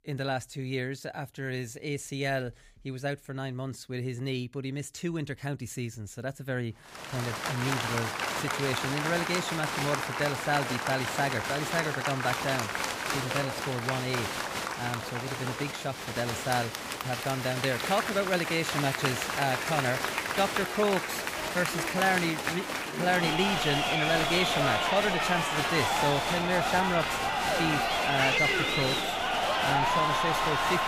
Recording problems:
crowd noise; very loud; from 7 s on; 2 dB above the speech

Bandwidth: 15 kHz